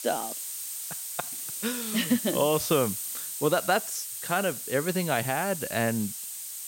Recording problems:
hiss; loud; throughout; 5 dB below the speech

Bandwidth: 16.5 kHz